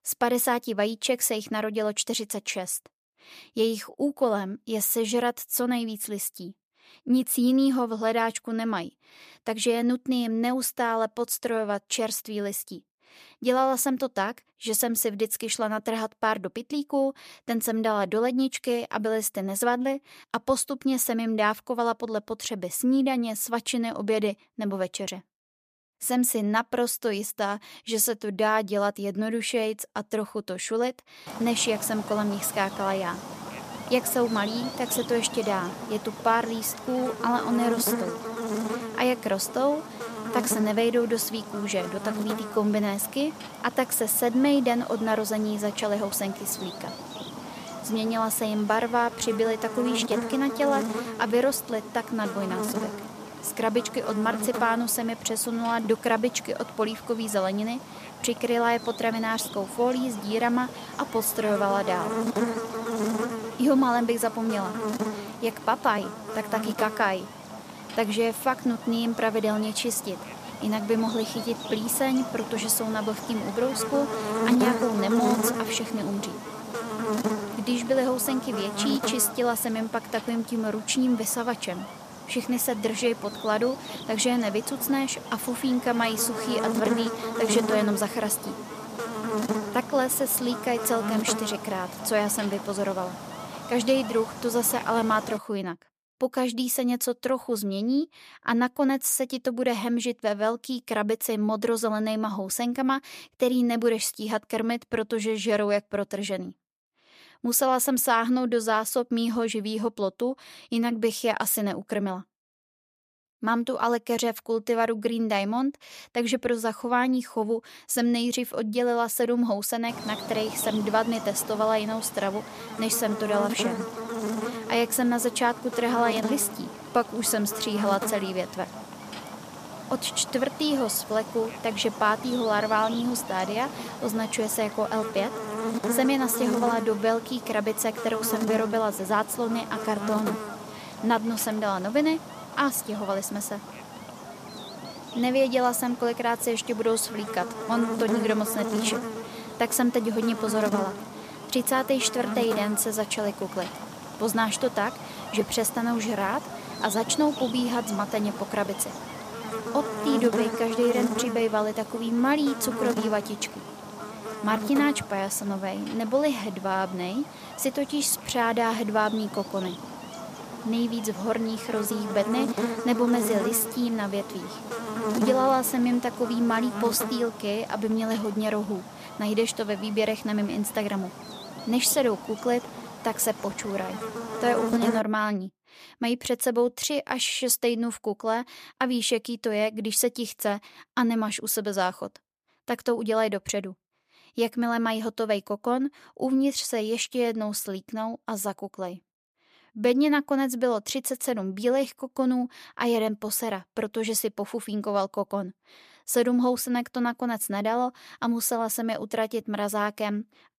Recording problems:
electrical hum; loud; from 31 s to 1:35 and from 2:00 to 3:05; 60 Hz, 8 dB below the speech

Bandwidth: 14.5 kHz